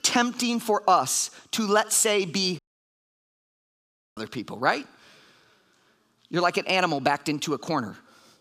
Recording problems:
audio cutting out; at 2.5 s for 1.5 s

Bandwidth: 15 kHz